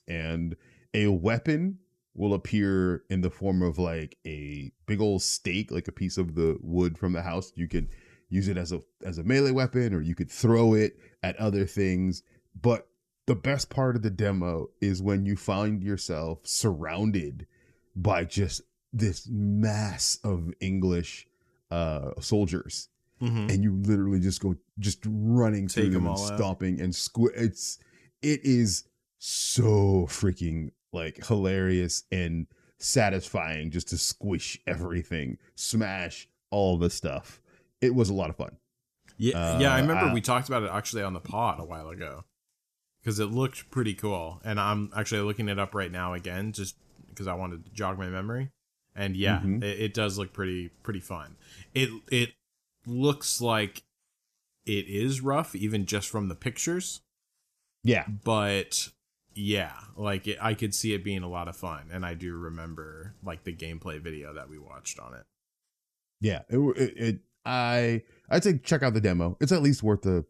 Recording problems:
none

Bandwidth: 14 kHz